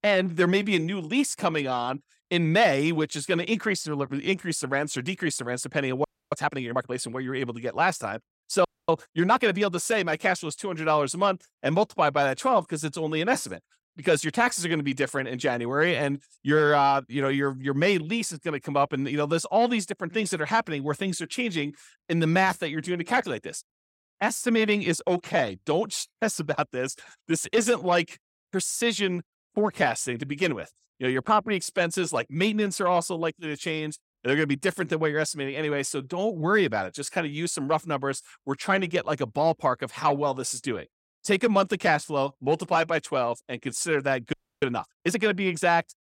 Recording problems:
audio freezing; at 6 s, at 8.5 s and at 44 s

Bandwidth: 16.5 kHz